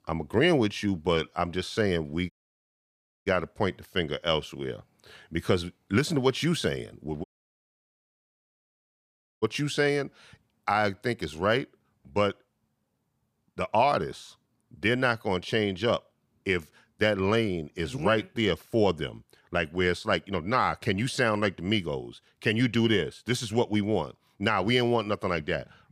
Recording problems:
audio cutting out; at 2.5 s for 1 s and at 7 s for 2 s

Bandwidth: 15 kHz